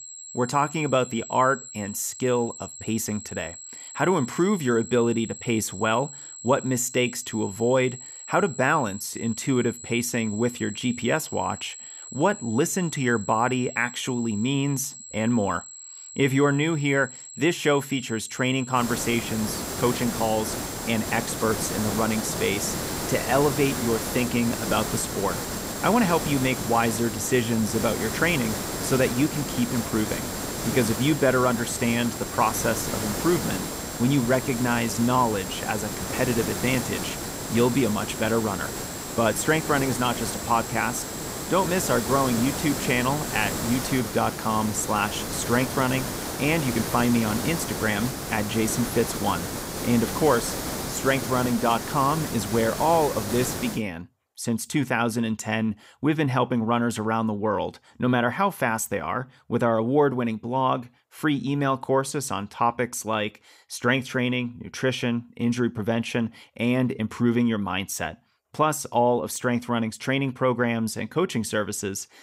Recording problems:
hiss; loud; from 19 to 54 s; 5 dB below the speech
high-pitched whine; noticeable; until 44 s; 7.5 kHz, 15 dB below the speech

